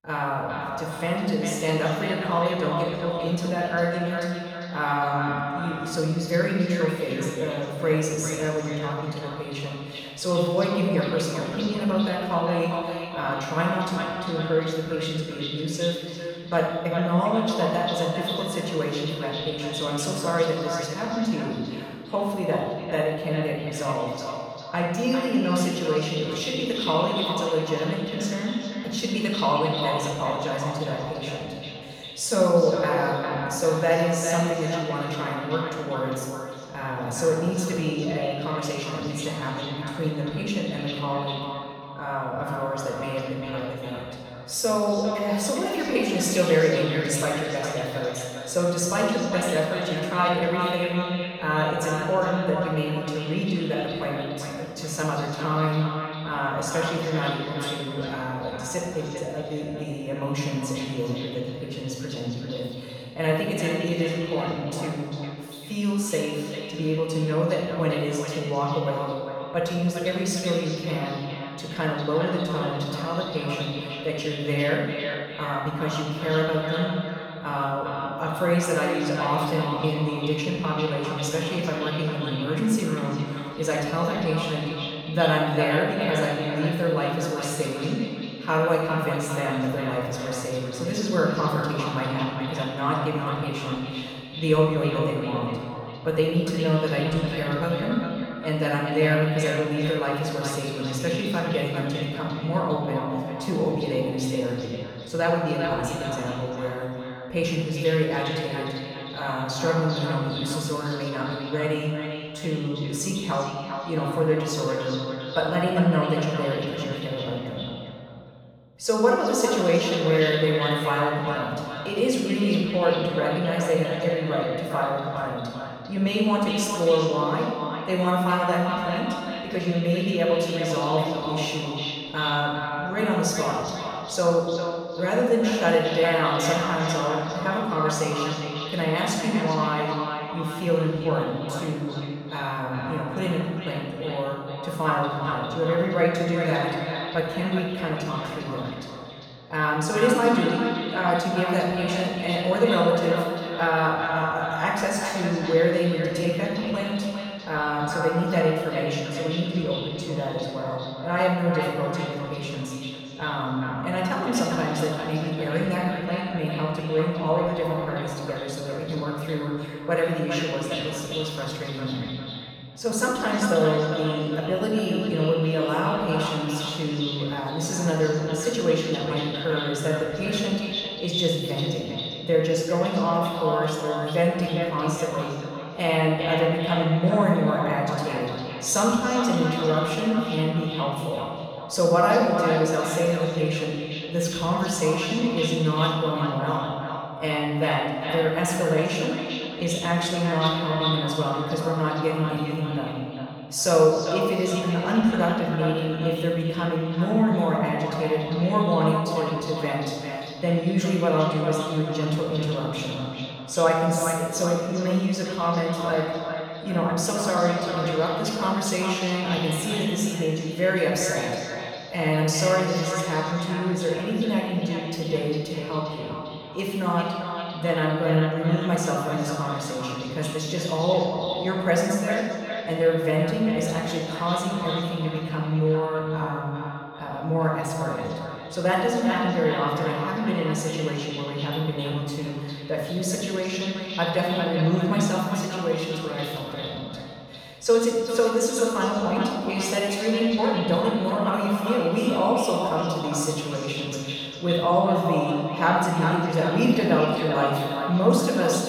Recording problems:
echo of what is said; strong; throughout; 400 ms later, 8 dB below the speech
off-mic speech; far
room echo; noticeable; dies away in 1.6 s

